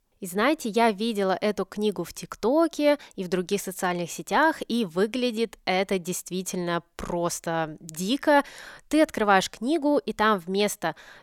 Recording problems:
none

